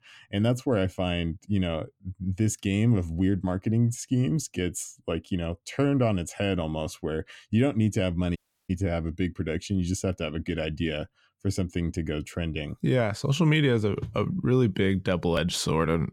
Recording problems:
audio cutting out; at 8.5 s

